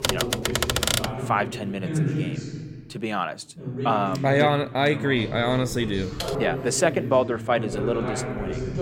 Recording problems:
voice in the background; loud; throughout; 6 dB below the speech
keyboard typing; loud; until 1 s; peak 3 dB above the speech
keyboard typing; faint; at 6 s; peak 10 dB below the speech

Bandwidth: 16 kHz